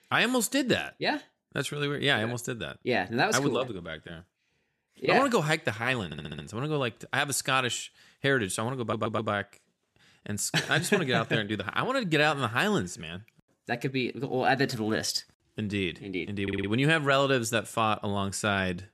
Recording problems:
audio stuttering; at 6 s, at 9 s and at 16 s

